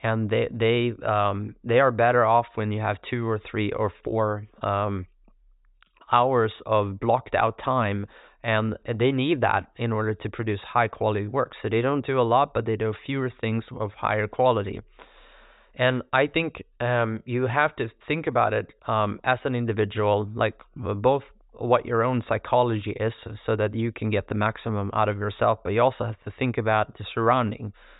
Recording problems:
high frequencies cut off; severe; nothing above 4 kHz

